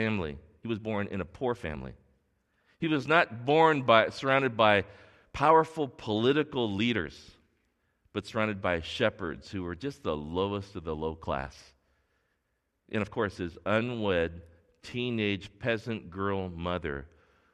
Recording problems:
abrupt cut into speech; at the start
uneven, jittery; strongly; from 0.5 to 15 s

